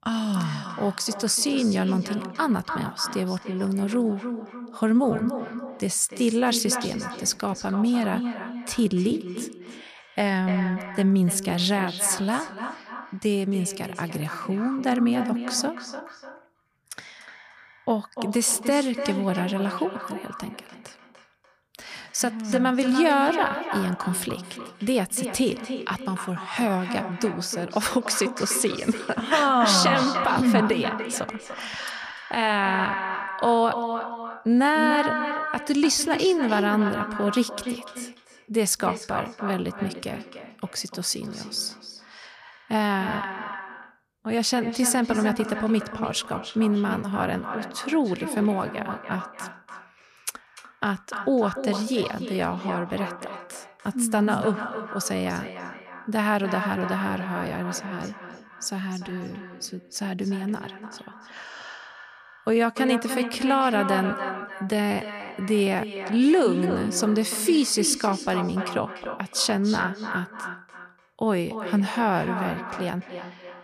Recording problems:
echo of what is said; strong; throughout; 290 ms later, 8 dB below the speech

